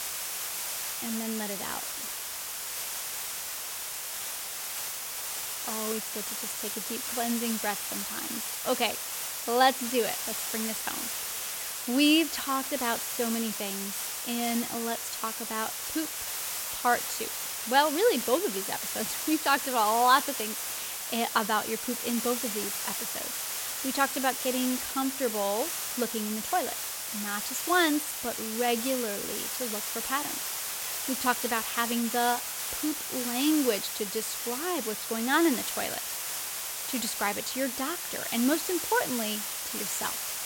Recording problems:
hiss; loud; throughout; 2 dB below the speech

